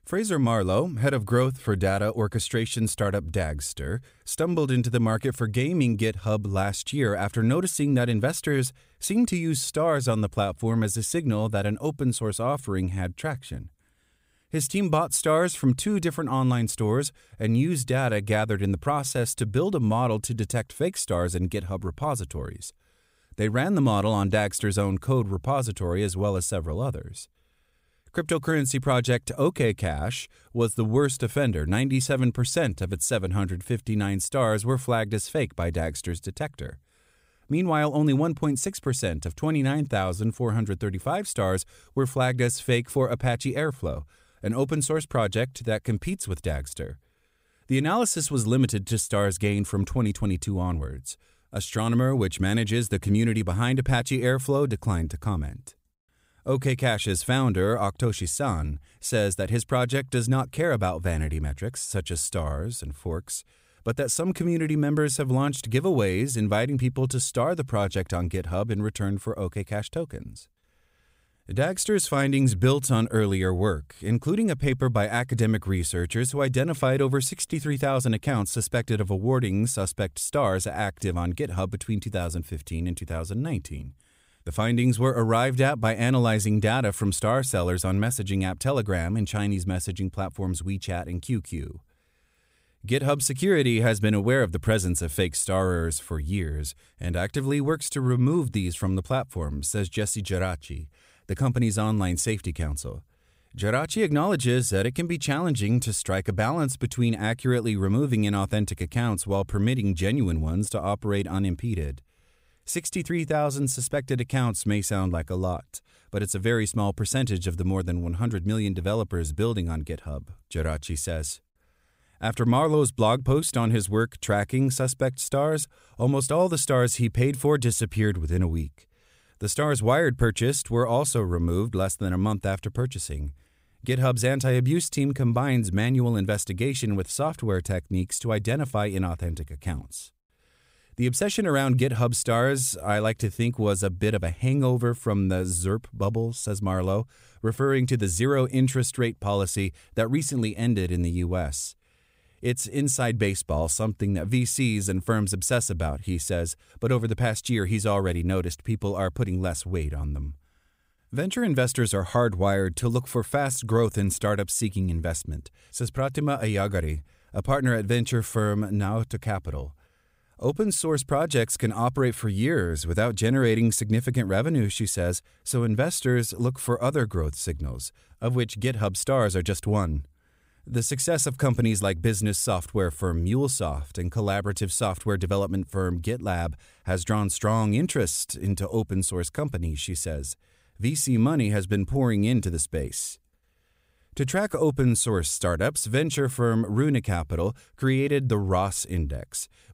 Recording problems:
none

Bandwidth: 15.5 kHz